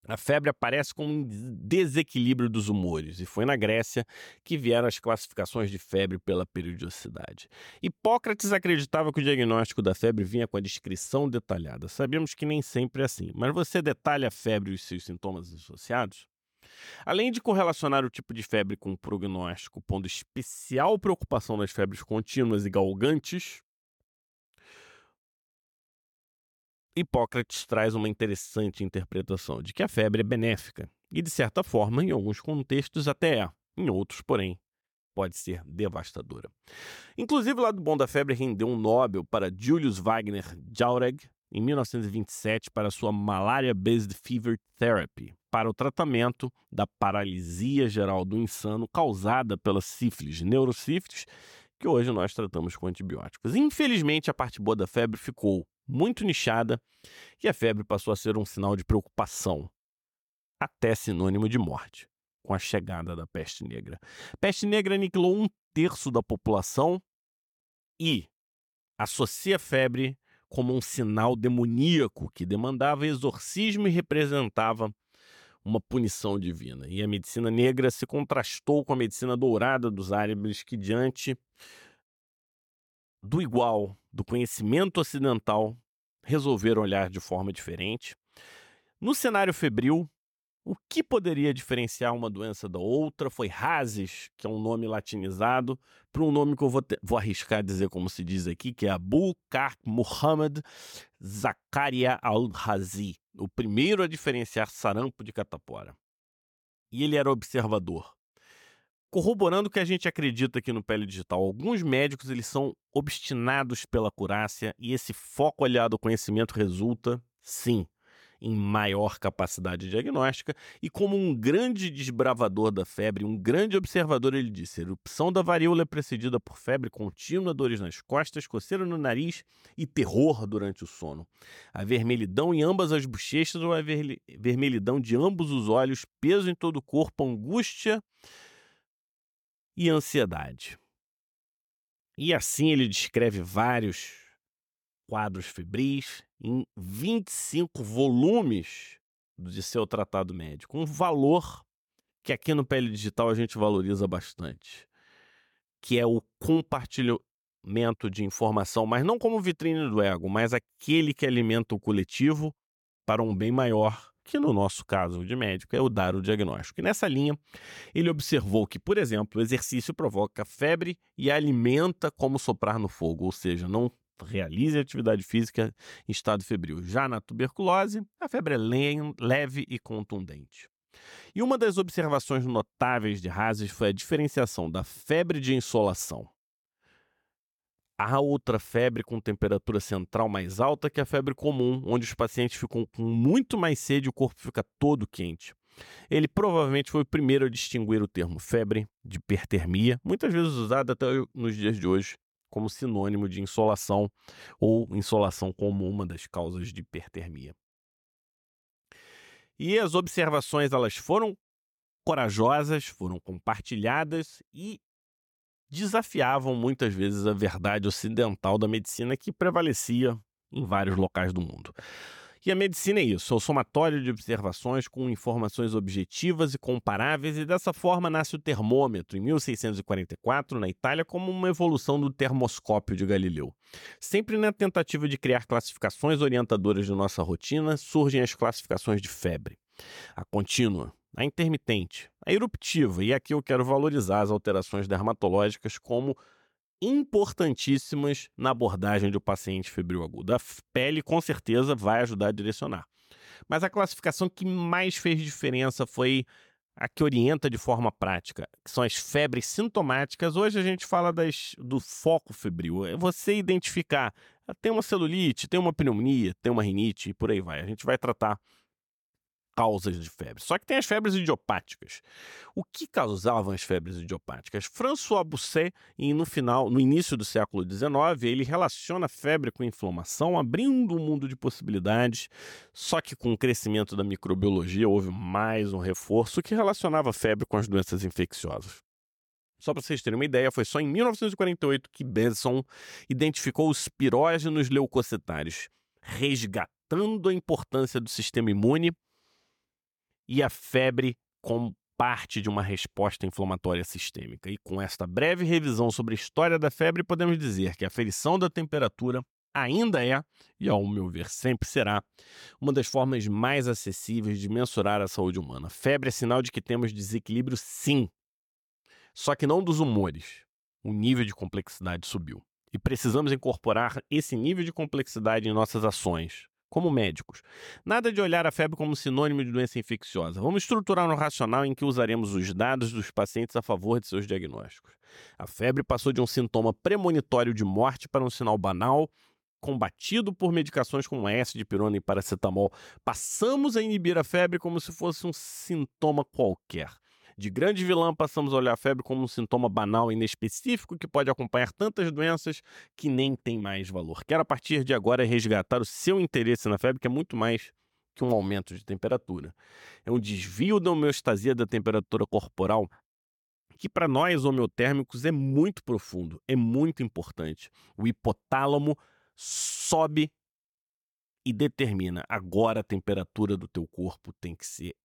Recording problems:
none

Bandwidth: 18 kHz